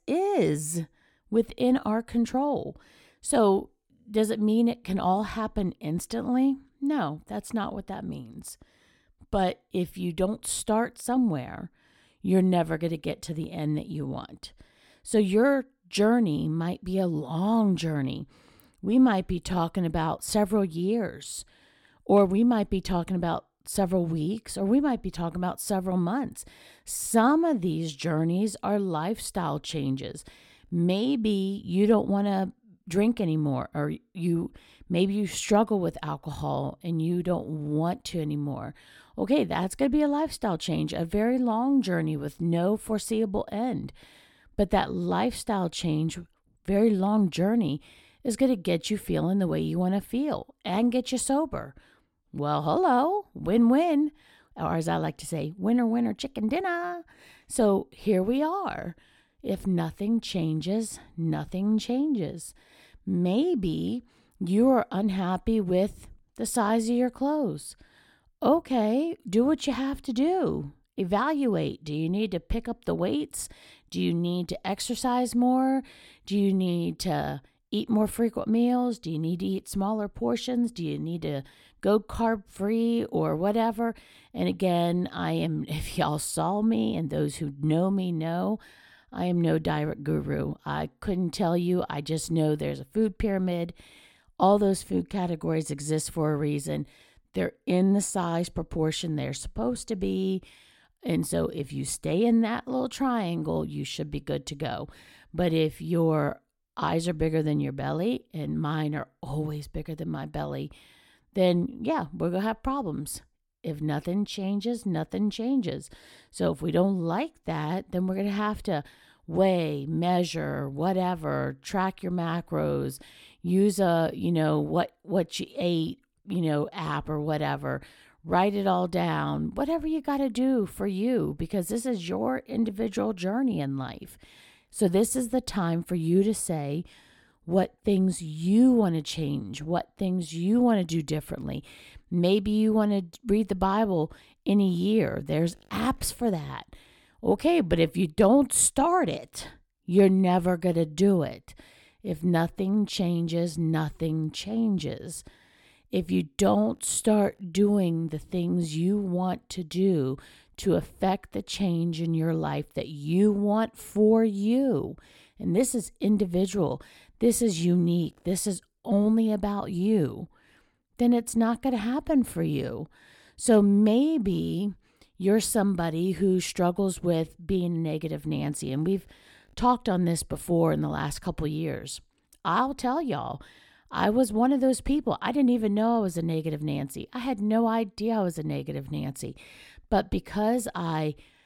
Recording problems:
none

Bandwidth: 17 kHz